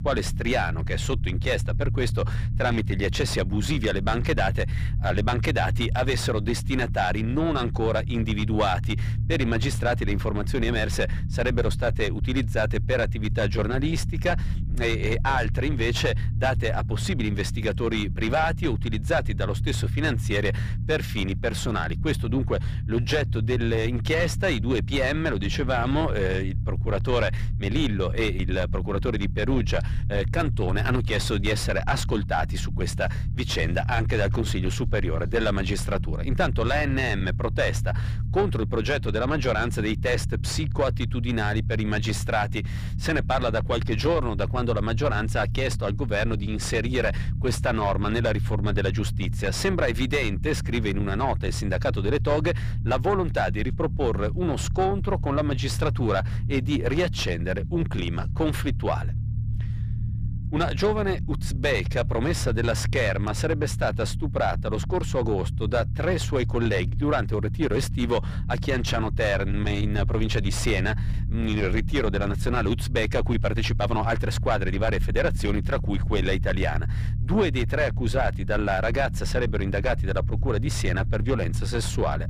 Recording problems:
distortion; slight; 10 dB below the speech
low rumble; noticeable; throughout; 15 dB below the speech

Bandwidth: 15 kHz